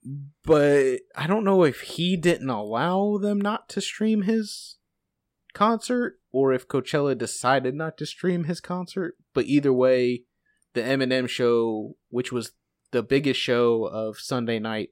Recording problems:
none

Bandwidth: 16 kHz